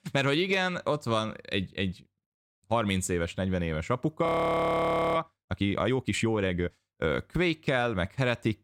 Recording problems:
audio freezing; at 4.5 s for 1 s

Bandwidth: 16.5 kHz